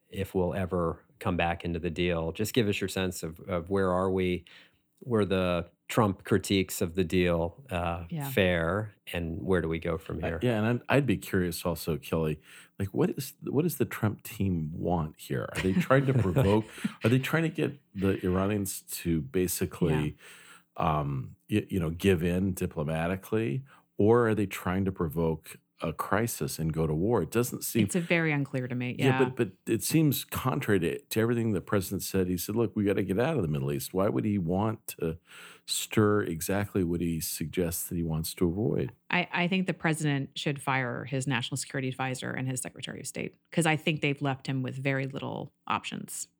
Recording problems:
none

